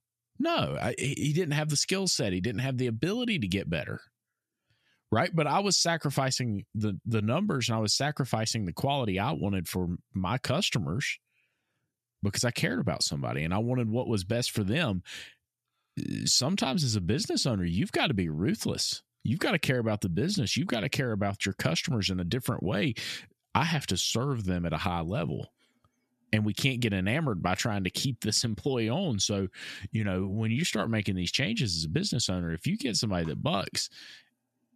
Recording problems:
none

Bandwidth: 13.5 kHz